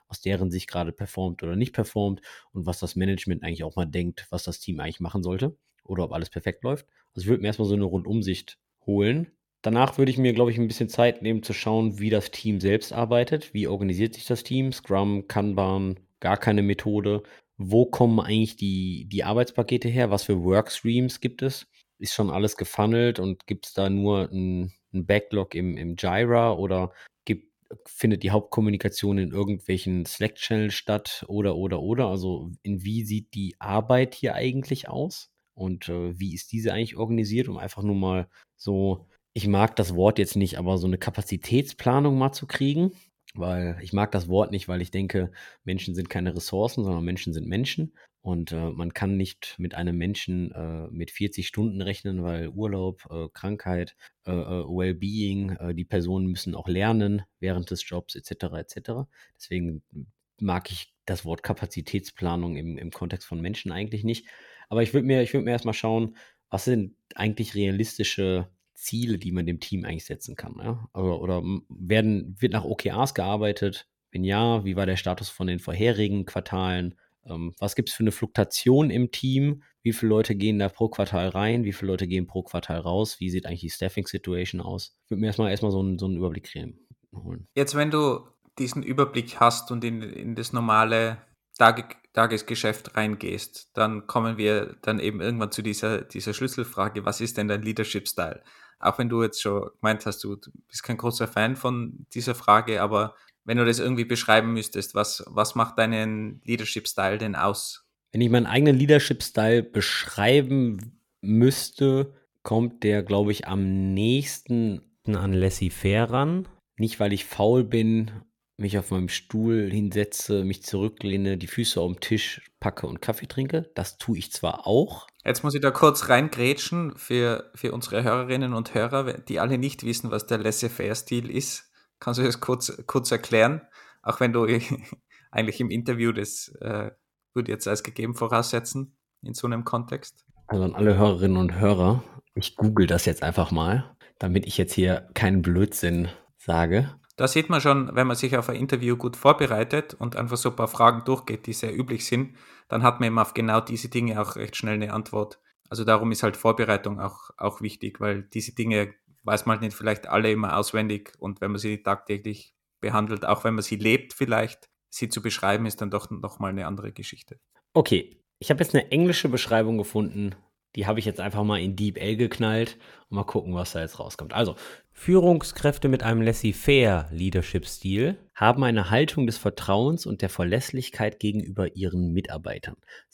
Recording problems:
none

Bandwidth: 17.5 kHz